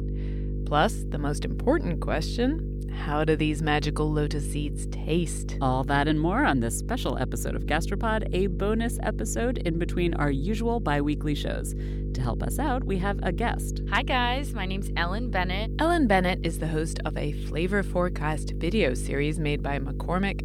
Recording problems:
electrical hum; noticeable; throughout; 50 Hz, 15 dB below the speech

